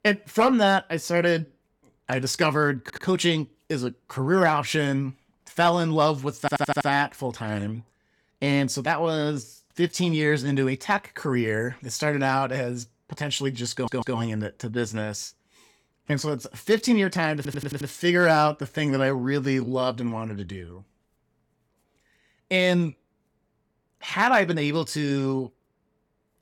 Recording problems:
audio stuttering; 4 times, first at 3 s

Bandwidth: 18.5 kHz